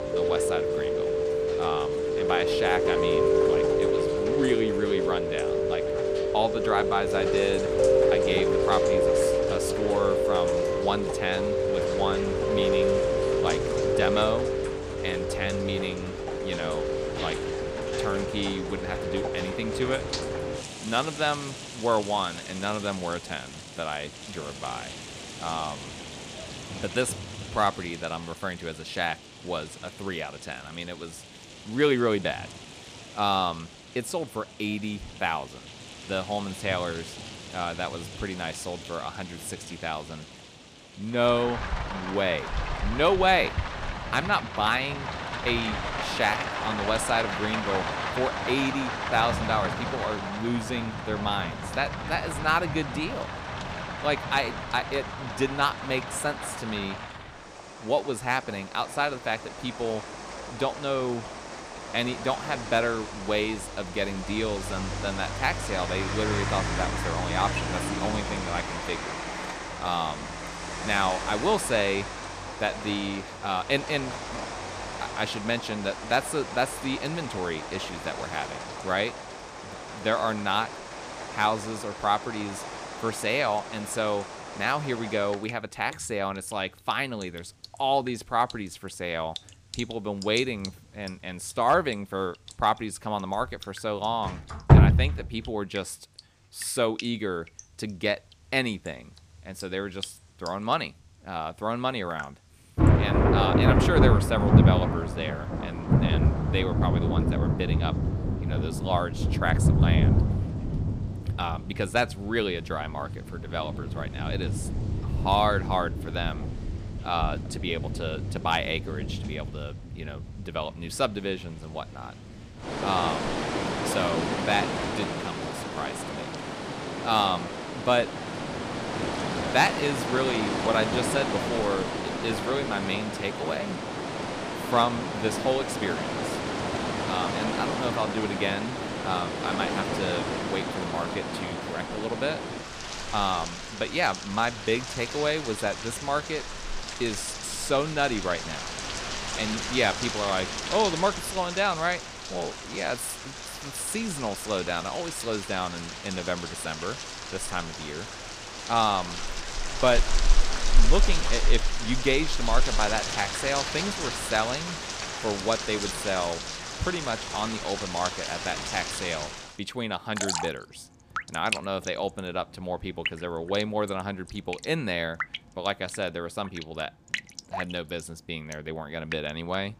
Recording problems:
rain or running water; loud; throughout; as loud as the speech

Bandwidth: 15 kHz